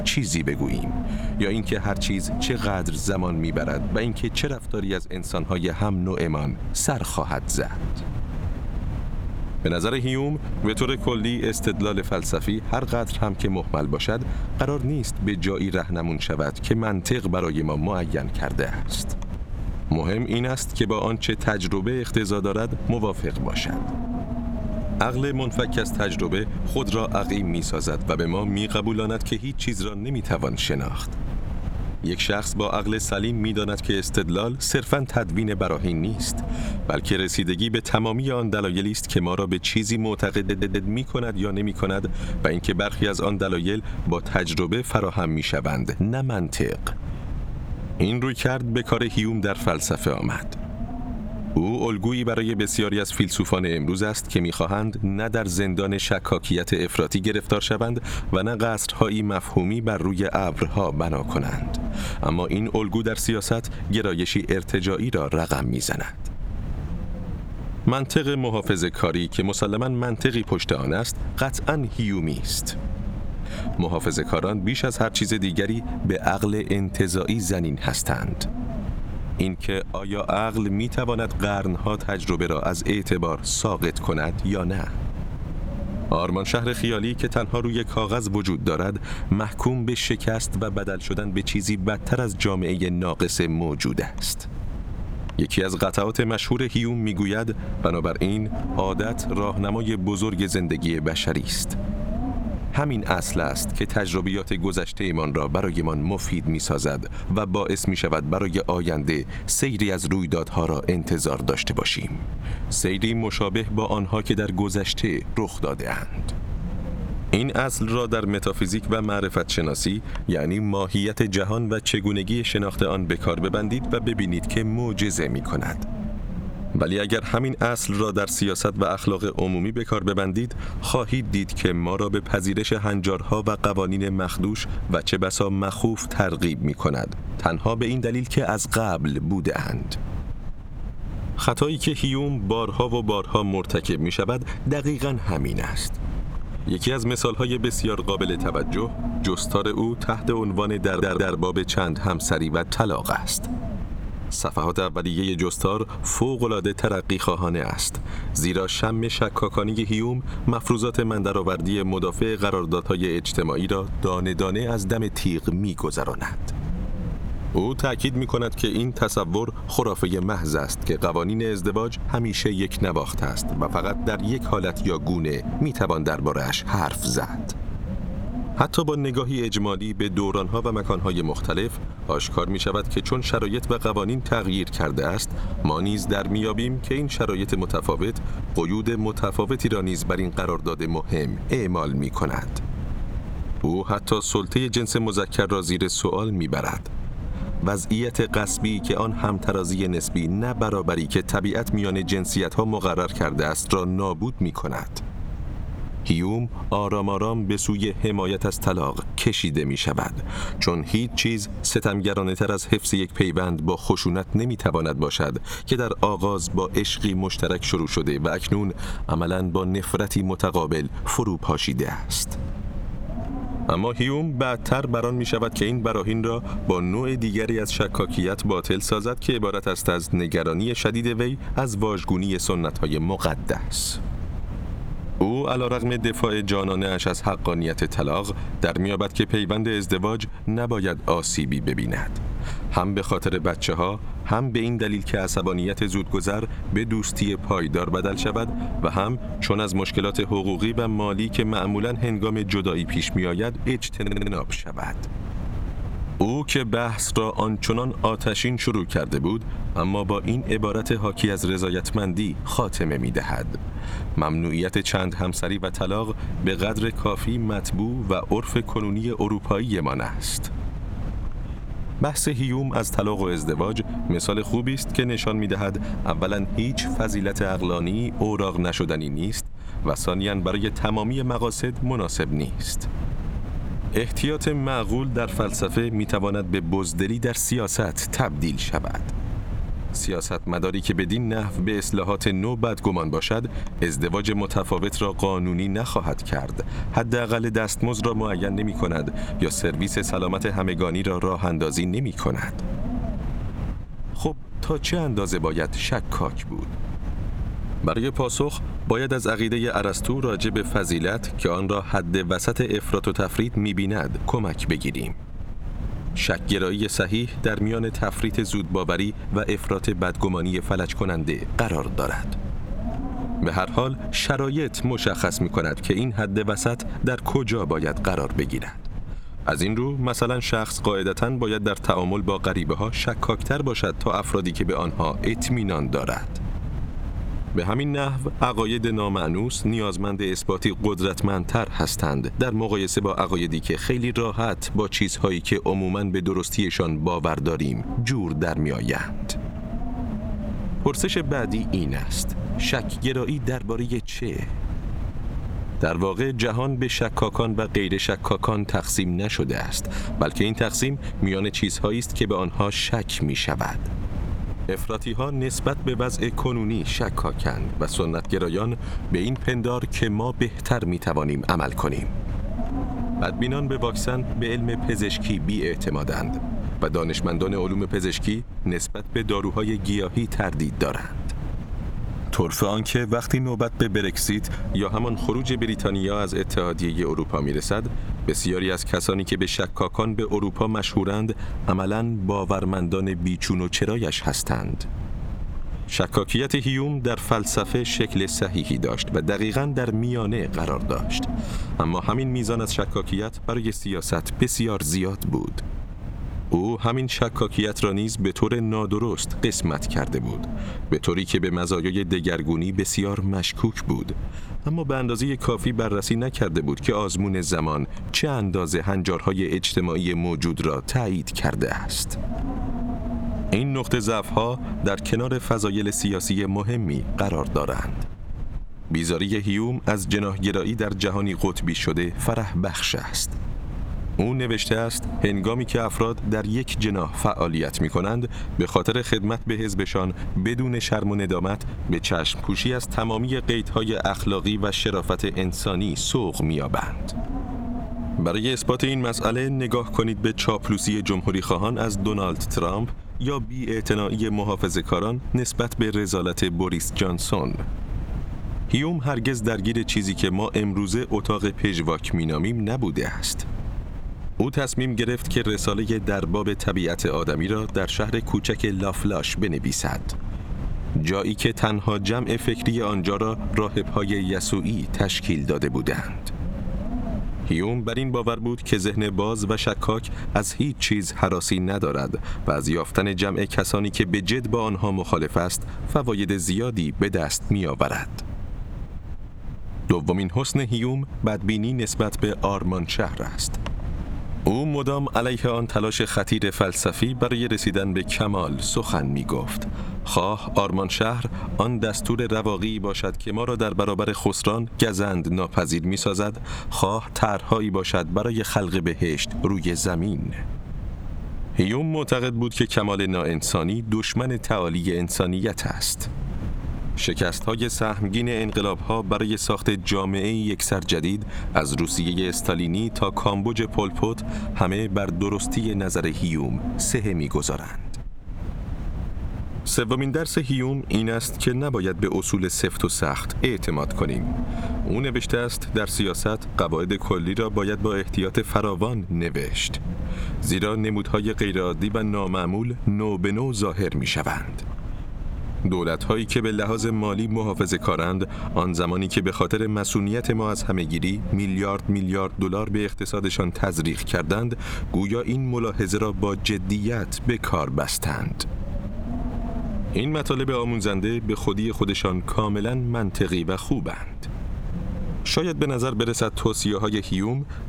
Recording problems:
squashed, flat; somewhat
wind noise on the microphone; occasional gusts; 15 dB below the speech
audio stuttering; at 40 s, at 2:31 and at 4:14

